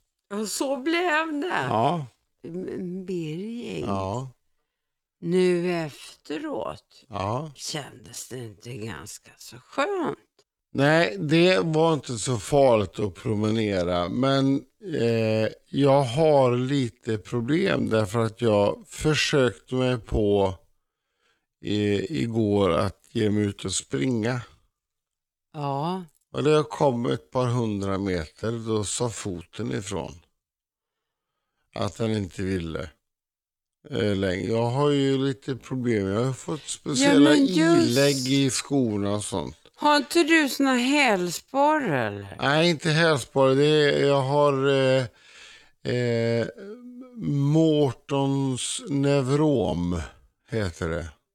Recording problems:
wrong speed, natural pitch; too slow; 0.6 times normal speed

